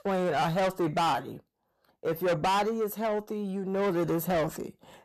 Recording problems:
distortion; heavy; 6 dB below the speech

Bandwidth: 13.5 kHz